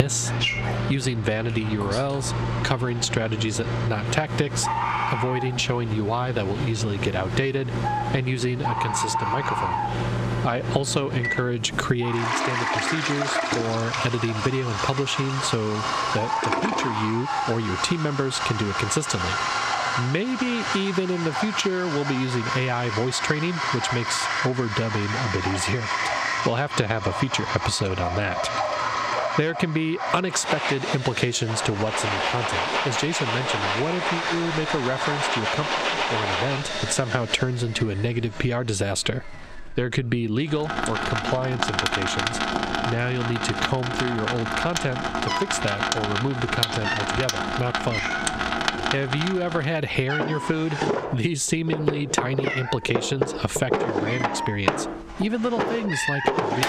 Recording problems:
distortion; heavy; 8 dB below the speech
squashed, flat; somewhat, background pumping
animal sounds; loud; throughout; 5 dB below the speech
household noises; loud; throughout; 1 dB below the speech
abrupt cut into speech; at the start and the end

